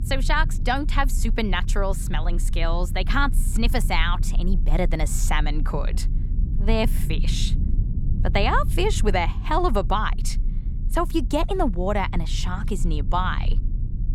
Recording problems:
low rumble; noticeable; throughout; 20 dB below the speech

